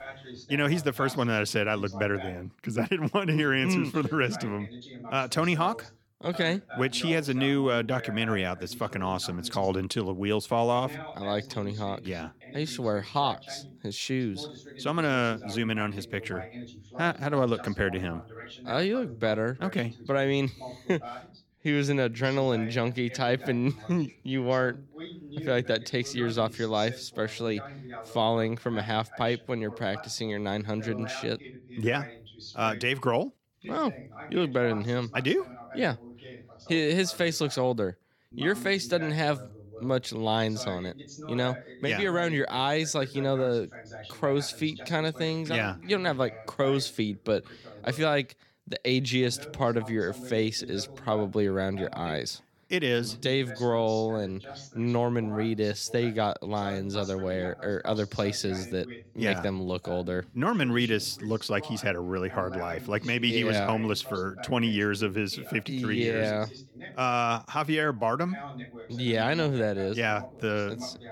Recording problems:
voice in the background; noticeable; throughout; 15 dB below the speech

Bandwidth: 17.5 kHz